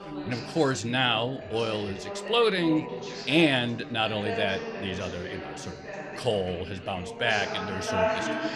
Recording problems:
background chatter; loud; throughout; 3 voices, 7 dB below the speech

